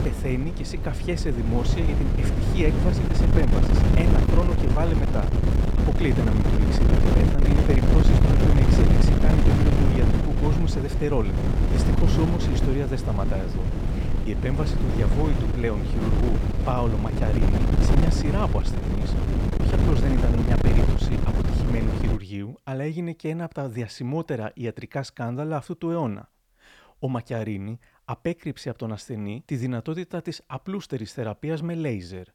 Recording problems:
wind noise on the microphone; heavy; until 22 s; 1 dB above the speech

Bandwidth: 19 kHz